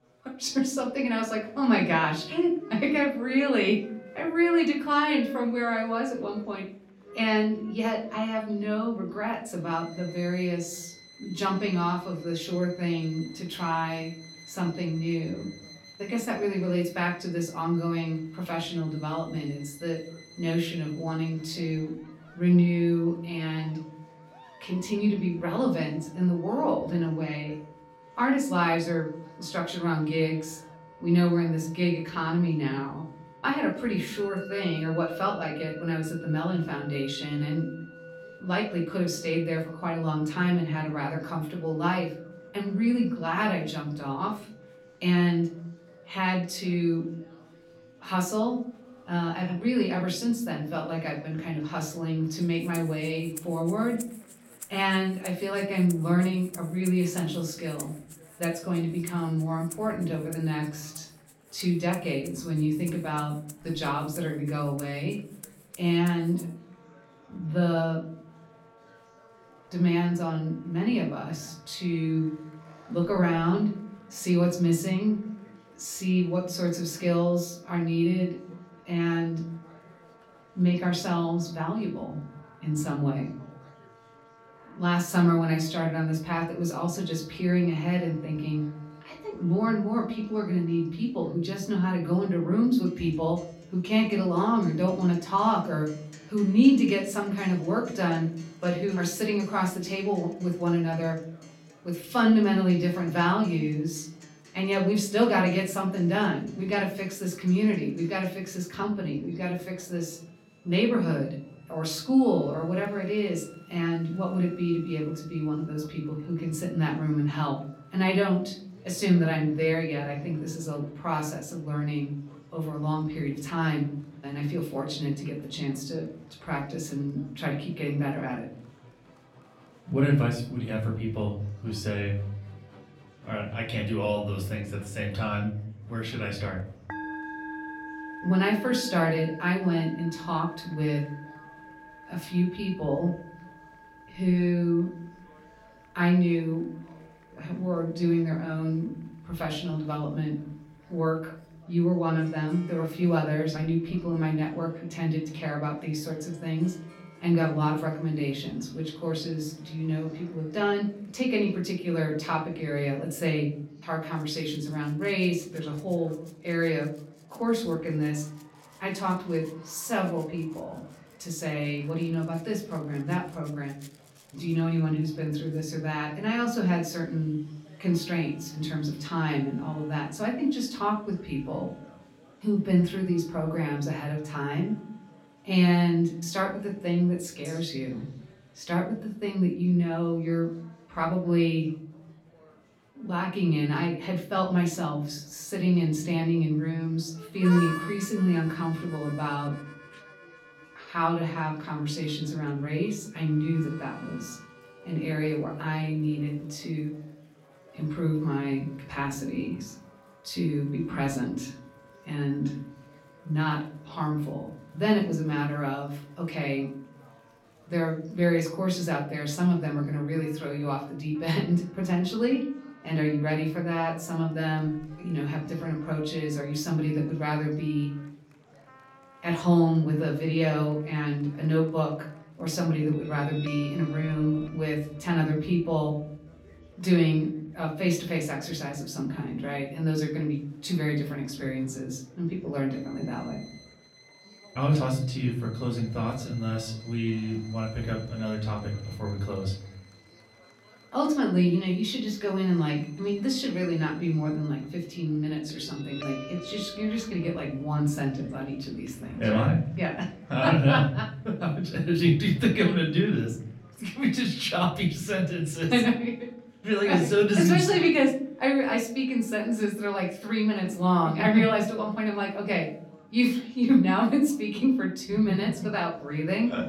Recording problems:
off-mic speech; far
room echo; slight; dies away in 0.7 s
background music; faint; throughout; 20 dB below the speech
murmuring crowd; faint; throughout; 30 dB below the speech

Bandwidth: 16.5 kHz